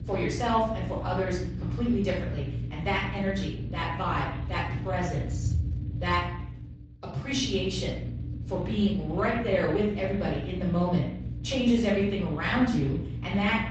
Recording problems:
off-mic speech; far
room echo; noticeable; dies away in 0.6 s
garbled, watery; slightly; nothing above 7.5 kHz
low rumble; noticeable; throughout; 15 dB below the speech

